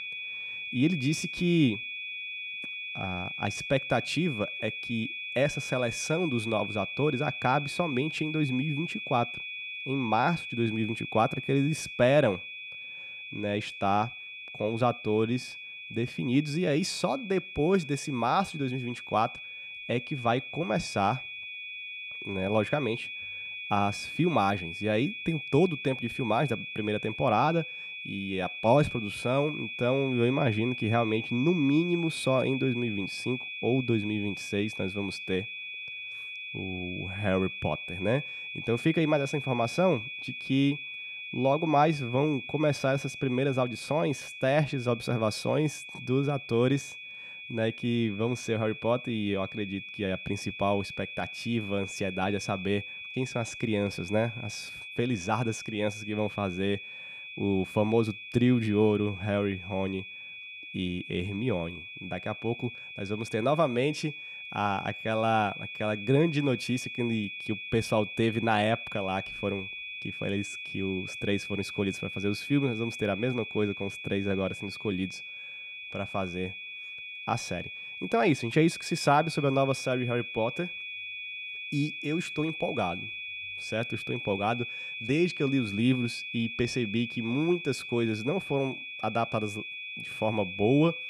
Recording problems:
high-pitched whine; loud; throughout; 2.5 kHz, 8 dB below the speech

